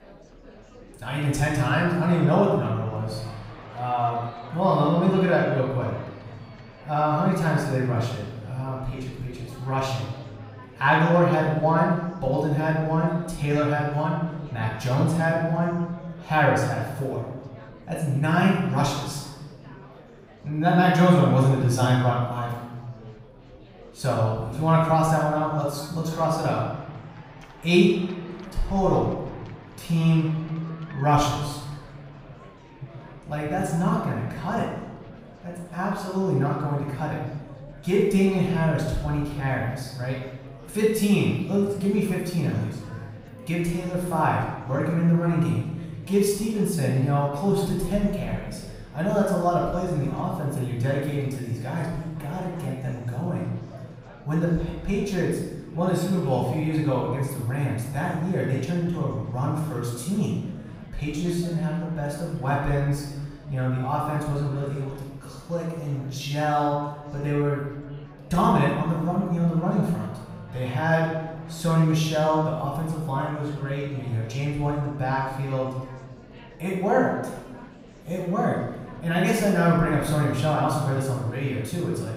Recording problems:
off-mic speech; far
room echo; noticeable; dies away in 1.1 s
murmuring crowd; faint; throughout; 20 dB below the speech

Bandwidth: 15.5 kHz